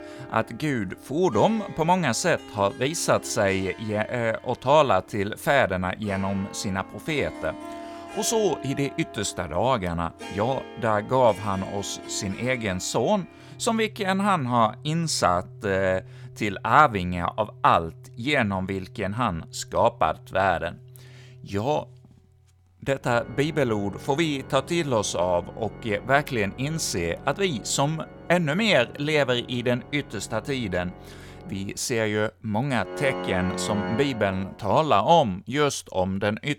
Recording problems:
background music; noticeable; throughout; 15 dB below the speech

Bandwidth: 17.5 kHz